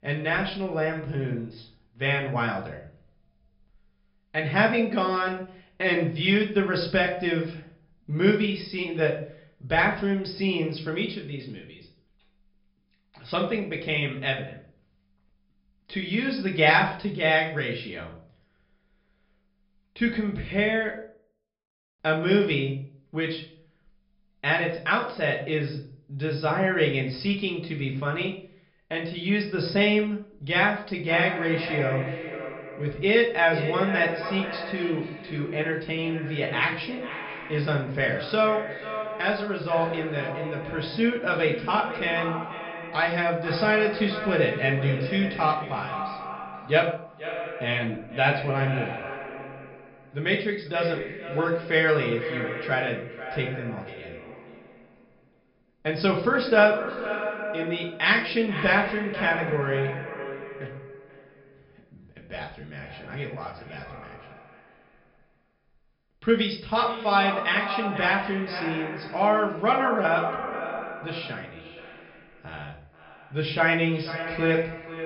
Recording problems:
echo of what is said; strong; from 31 s on; 490 ms later, 9 dB below the speech
off-mic speech; far
high frequencies cut off; noticeable; nothing above 5.5 kHz
room echo; slight; dies away in 0.4 s

